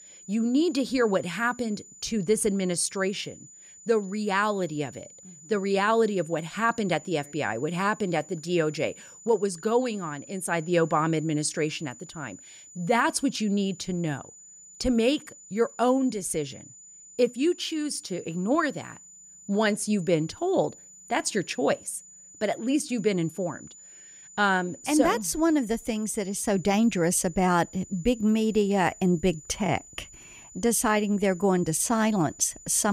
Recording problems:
high-pitched whine; faint; throughout; 7 kHz, 20 dB below the speech
abrupt cut into speech; at the end

